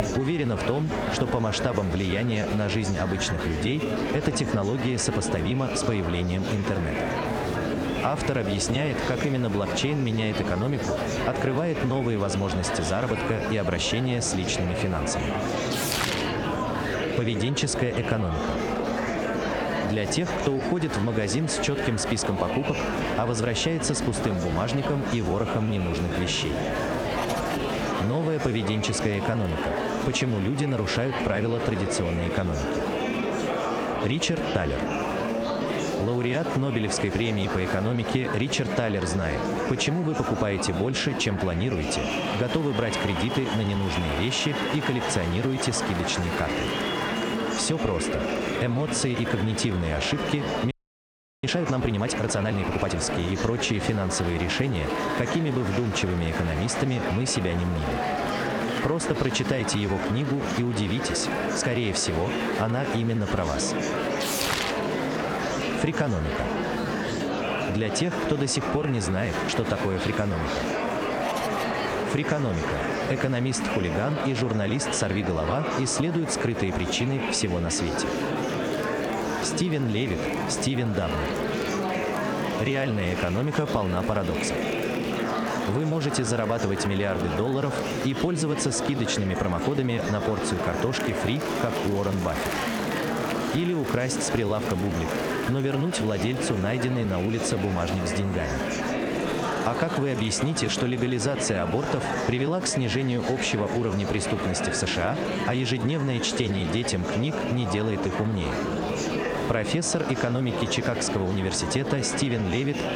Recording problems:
squashed, flat; somewhat, background pumping
murmuring crowd; loud; throughout; 3 dB below the speech
audio freezing; at 51 s for 0.5 s

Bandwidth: 19 kHz